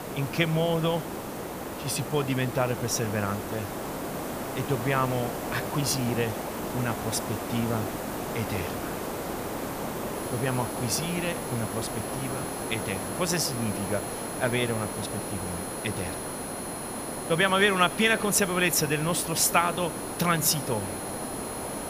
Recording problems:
hiss; loud; throughout; 6 dB below the speech
high-pitched whine; noticeable; from 10 s on; 10.5 kHz, 10 dB below the speech

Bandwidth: 15 kHz